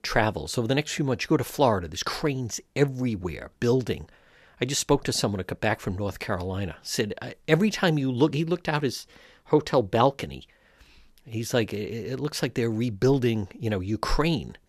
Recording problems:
none

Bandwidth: 14 kHz